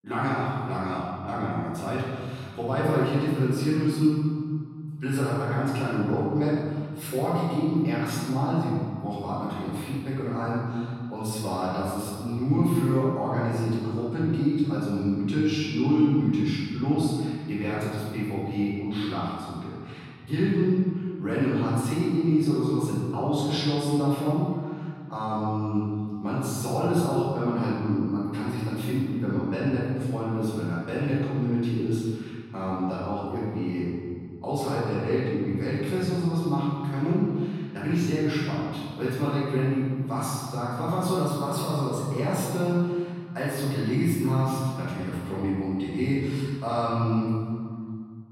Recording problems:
room echo; strong; dies away in 2 s
off-mic speech; far

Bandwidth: 16 kHz